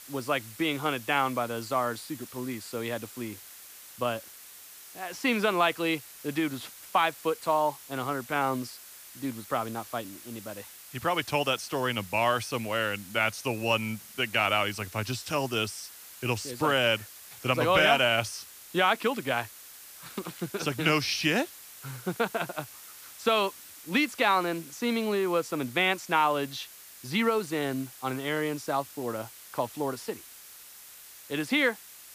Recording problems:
hiss; noticeable; throughout; 15 dB below the speech

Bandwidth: 15 kHz